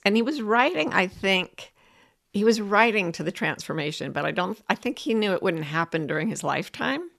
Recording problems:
none

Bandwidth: 13.5 kHz